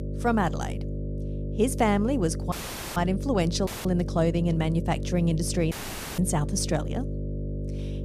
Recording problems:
electrical hum; noticeable; throughout; 50 Hz, 10 dB below the speech
audio cutting out; filled with static; at 2.5 s, at 3.5 s and at 5.5 s

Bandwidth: 14.5 kHz